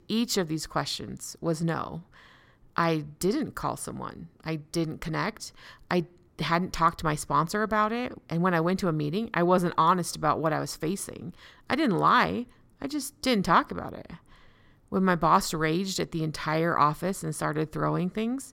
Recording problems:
none

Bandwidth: 16.5 kHz